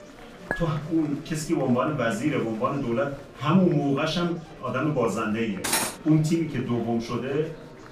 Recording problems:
off-mic speech; far
room echo; slight; dies away in 0.3 s
murmuring crowd; noticeable; throughout; 20 dB below the speech
background music; faint; throughout; 25 dB below the speech
clattering dishes; noticeable; at 0.5 s; peak 8 dB below the speech
clattering dishes; loud; at 5.5 s; peak 1 dB above the speech

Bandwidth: 15 kHz